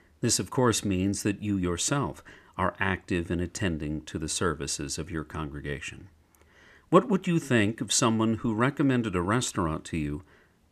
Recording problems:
none

